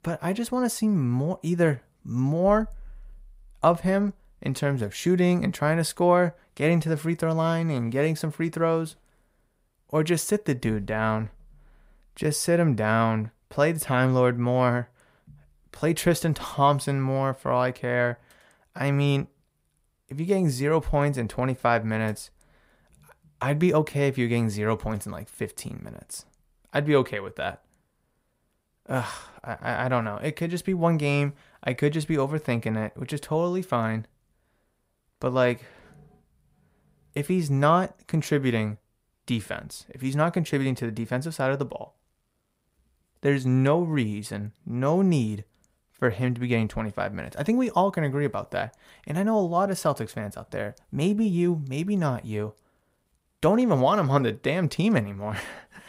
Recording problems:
none

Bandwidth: 15.5 kHz